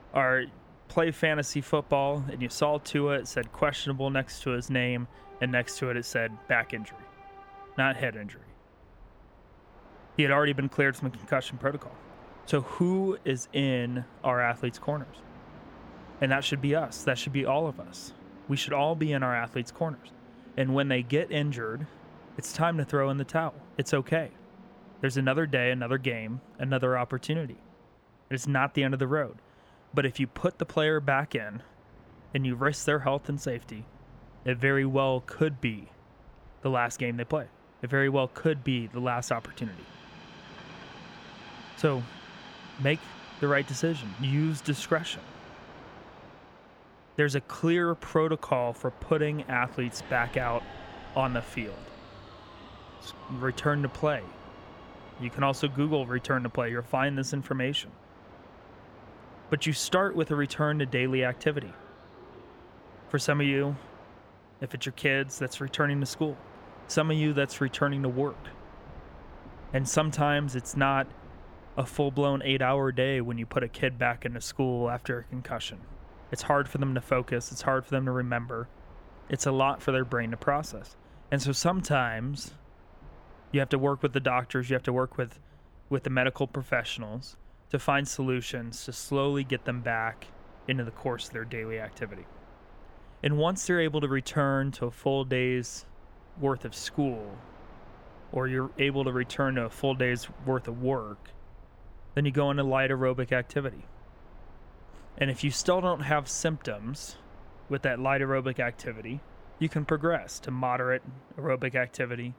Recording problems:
train or aircraft noise; faint; throughout; 20 dB below the speech

